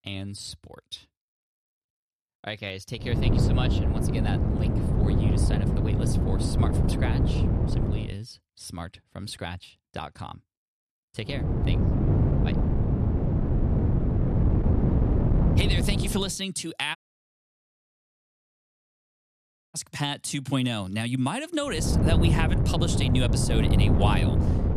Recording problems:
wind noise on the microphone; heavy; from 3 to 8 s, from 11 to 16 s and from 22 s on; 1 dB below the speech
audio cutting out; at 17 s for 3 s

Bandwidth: 13.5 kHz